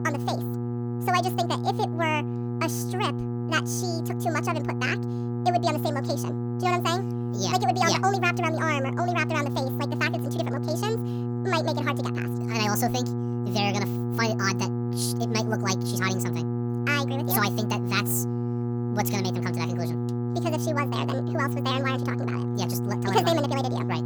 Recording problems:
wrong speed and pitch; too fast and too high; 1.7 times normal speed
electrical hum; loud; throughout; 60 Hz, 8 dB below the speech

